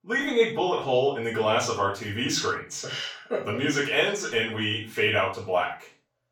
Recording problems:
off-mic speech; far
room echo; noticeable; dies away in 0.3 s

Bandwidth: 17.5 kHz